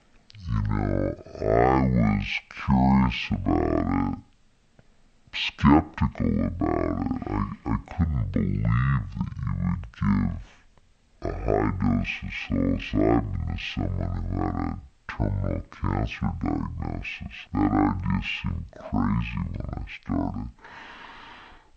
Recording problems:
wrong speed and pitch; too slow and too low; 0.5 times normal speed

